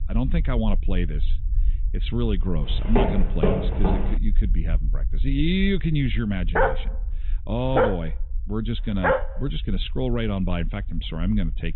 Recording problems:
high frequencies cut off; severe; nothing above 4 kHz
low rumble; faint; throughout; 20 dB below the speech
footsteps; loud; from 2.5 to 4 s; peak 3 dB above the speech
dog barking; loud; from 6.5 to 9 s; peak 5 dB above the speech

